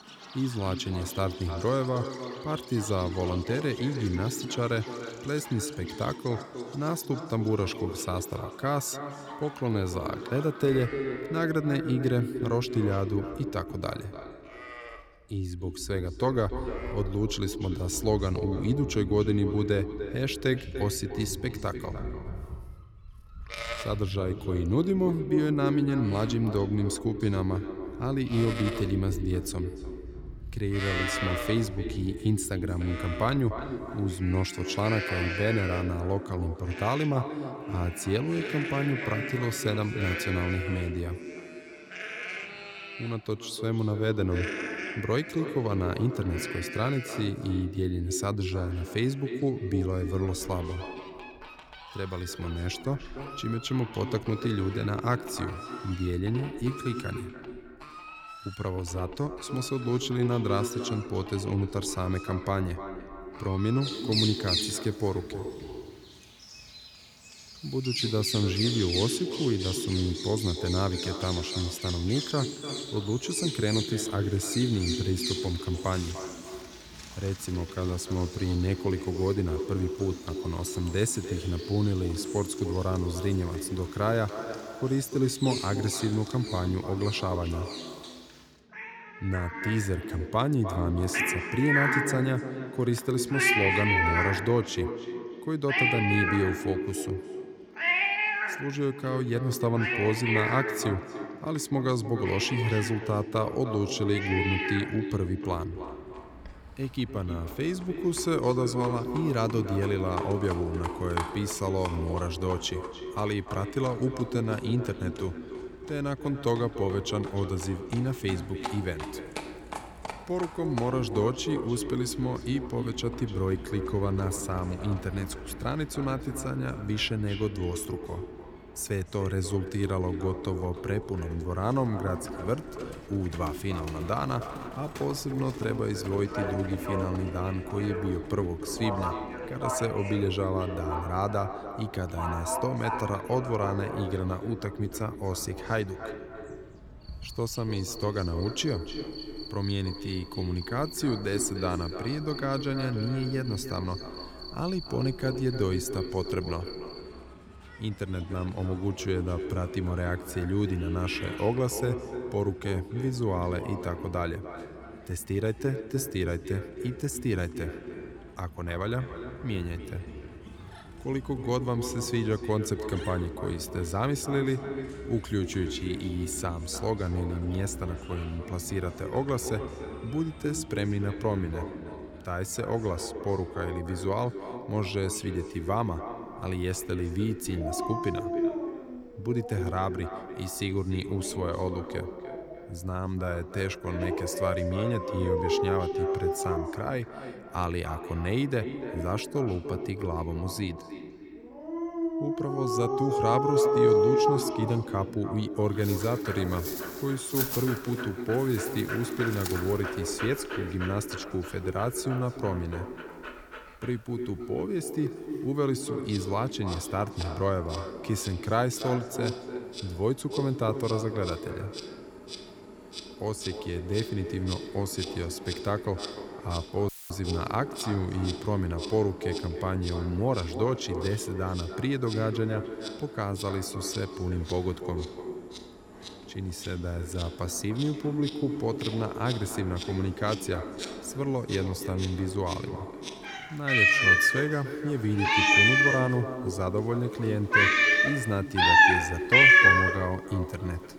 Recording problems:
echo of what is said; strong; throughout; 300 ms later, 8 dB below the speech
animal sounds; very loud; throughout; as loud as the speech
audio cutting out; filled with static; at 3:47

